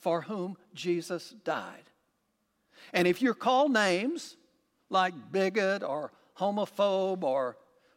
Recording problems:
none

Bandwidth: 16.5 kHz